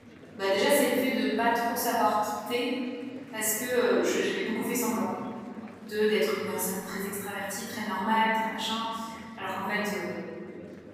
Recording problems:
room echo; strong; dies away in 2.6 s
off-mic speech; far
murmuring crowd; noticeable; throughout; 20 dB below the speech

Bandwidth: 15.5 kHz